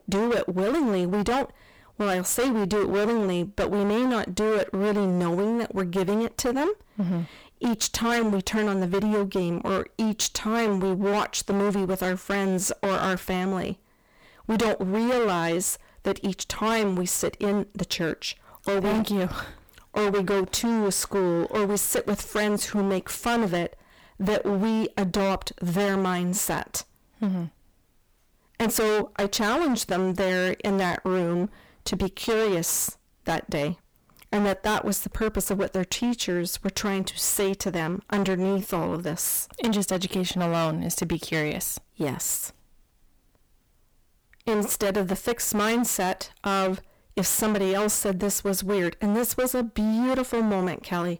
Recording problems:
distortion; heavy; 21% of the sound clipped

